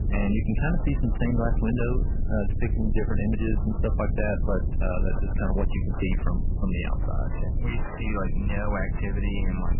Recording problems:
garbled, watery; badly; nothing above 3 kHz
distortion; slight; 10 dB below the speech
low rumble; loud; throughout; 8 dB below the speech

